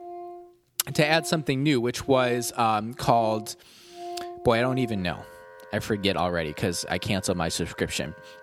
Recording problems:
background music; noticeable; throughout; 15 dB below the speech

